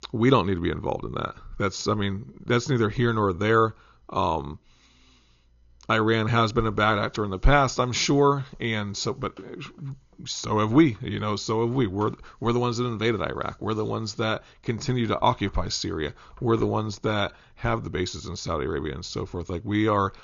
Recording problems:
high frequencies cut off; noticeable; nothing above 7 kHz

